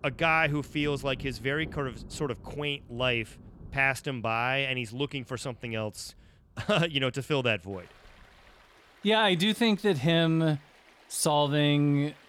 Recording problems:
rain or running water; faint; throughout; 25 dB below the speech

